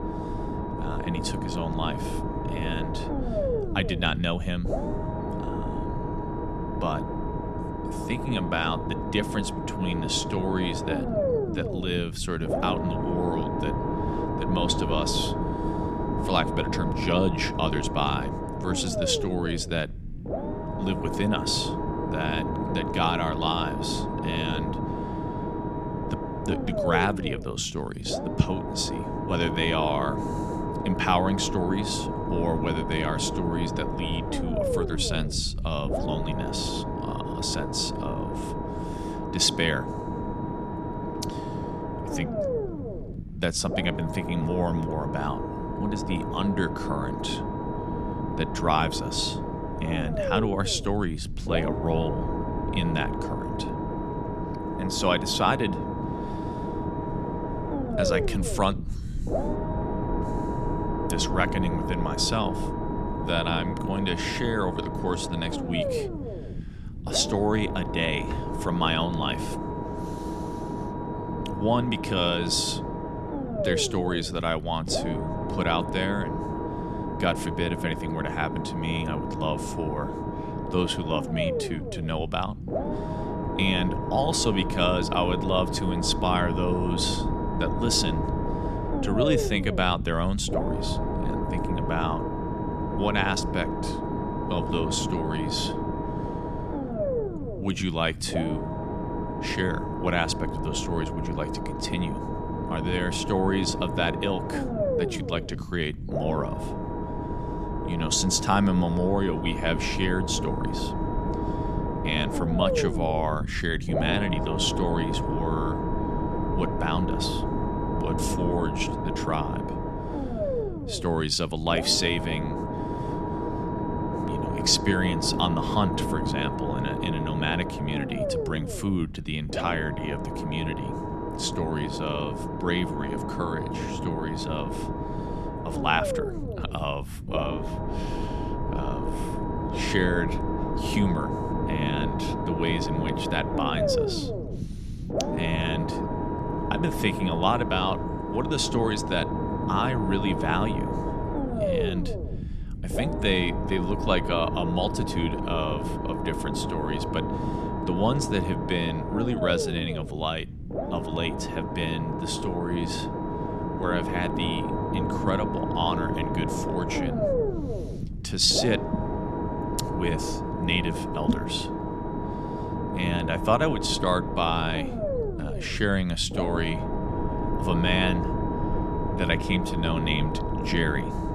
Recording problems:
low rumble; loud; throughout; 3 dB below the speech

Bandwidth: 13.5 kHz